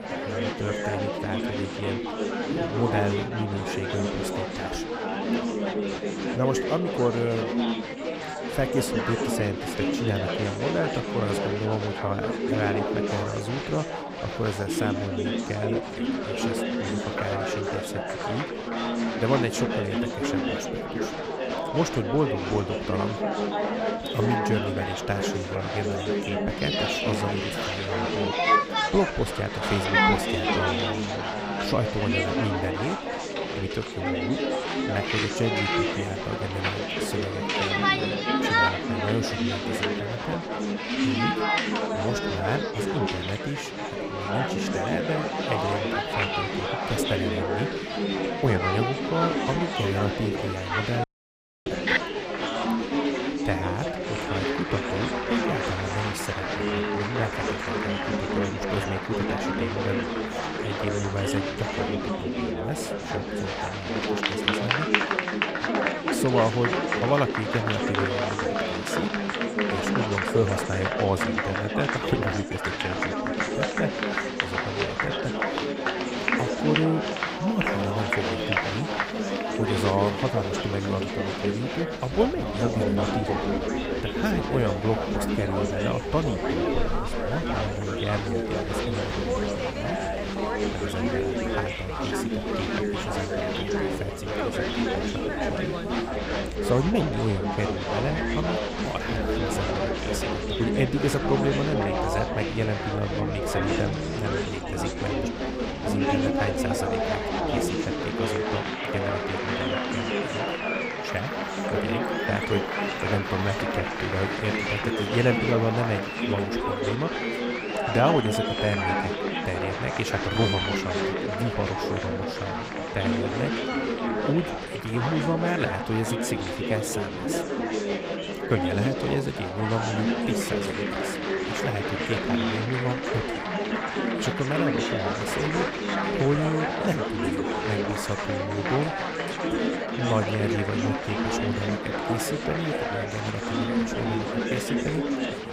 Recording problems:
chatter from many people; very loud; throughout; 3 dB above the speech
animal sounds; noticeable; from 1:17 on; 15 dB below the speech
audio cutting out; at 51 s for 0.5 s

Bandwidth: 15.5 kHz